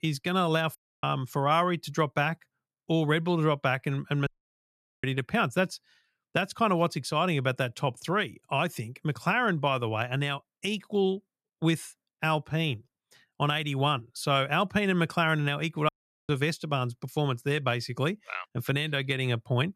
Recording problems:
audio cutting out; at 1 s, at 4.5 s for 1 s and at 16 s

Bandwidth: 14 kHz